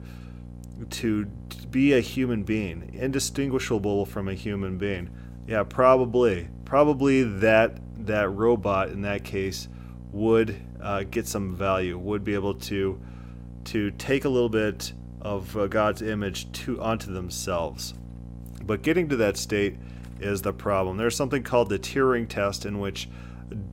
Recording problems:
electrical hum; faint; throughout; 60 Hz, 25 dB below the speech

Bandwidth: 16 kHz